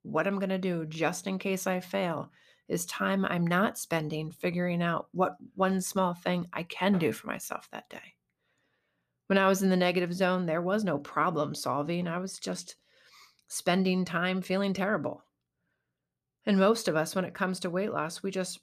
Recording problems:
none

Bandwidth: 14.5 kHz